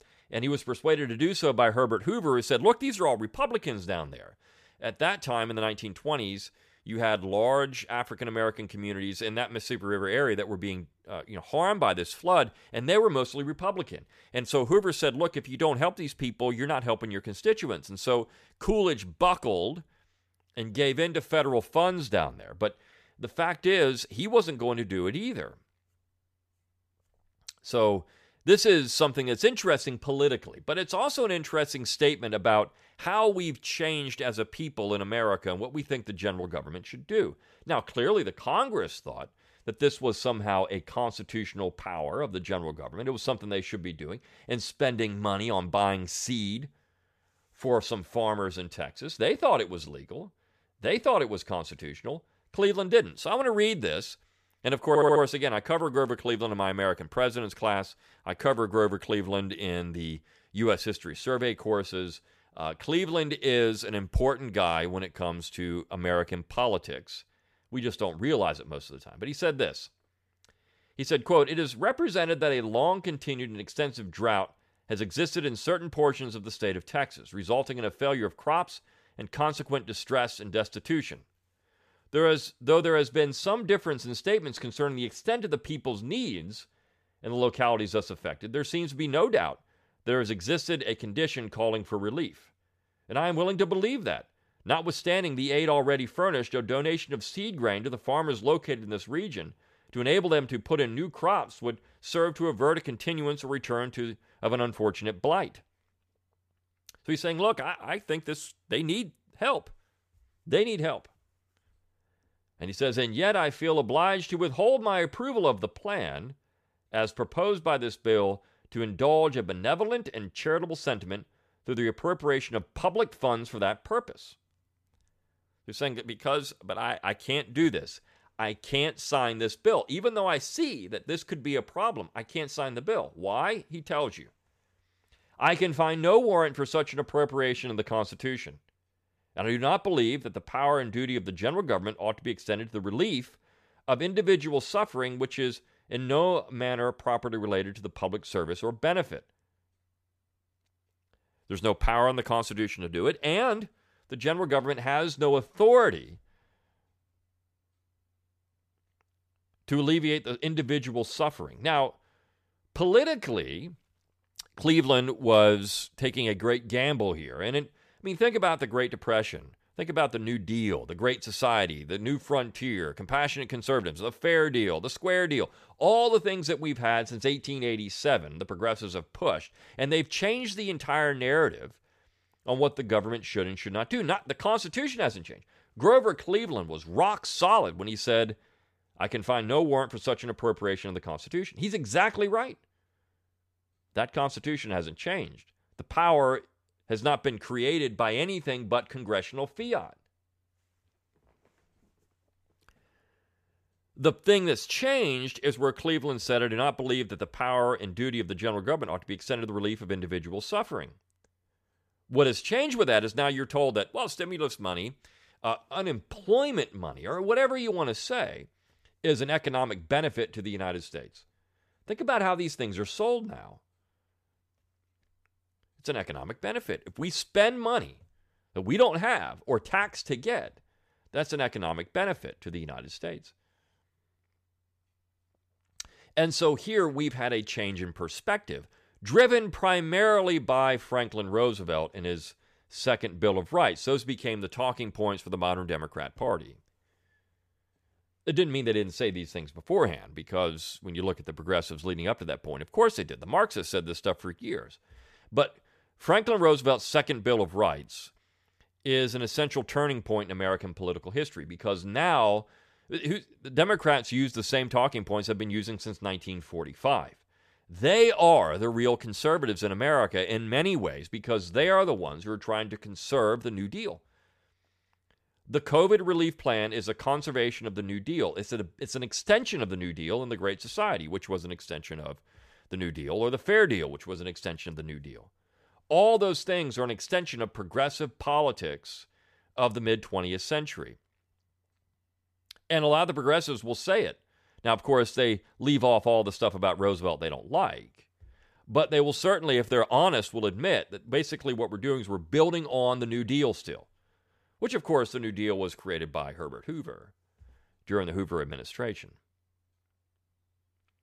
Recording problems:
audio stuttering; at 55 s

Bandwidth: 14.5 kHz